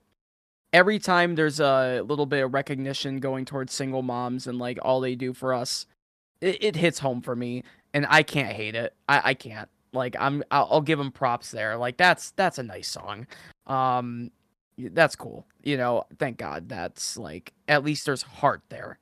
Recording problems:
none

